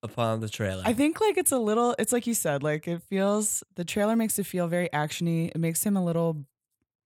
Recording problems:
none

